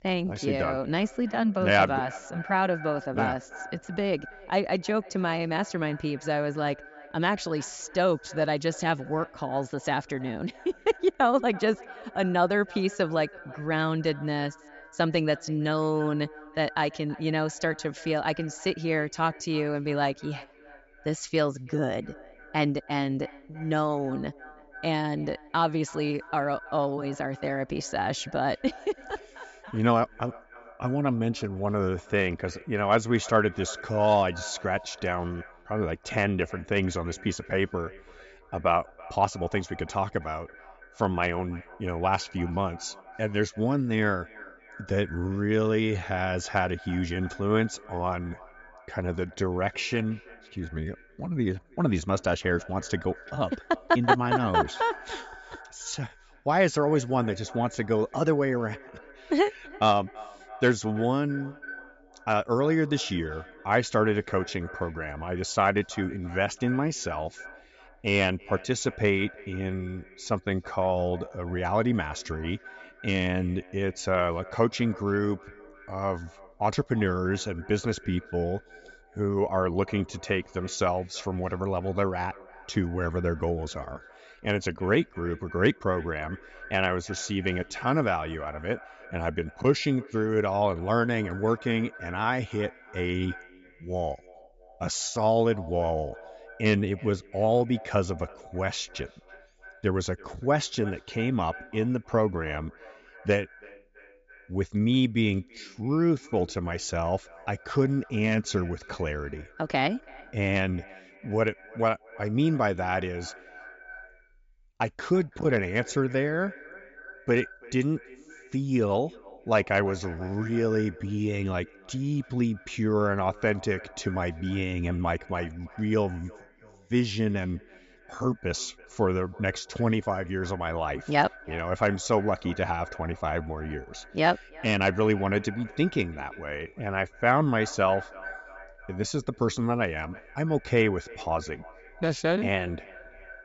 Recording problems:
high frequencies cut off; noticeable; nothing above 7.5 kHz
echo of what is said; faint; throughout; 330 ms later, 20 dB below the speech

